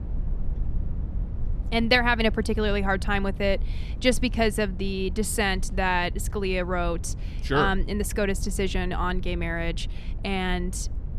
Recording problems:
low rumble; faint; throughout; 25 dB below the speech

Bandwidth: 14.5 kHz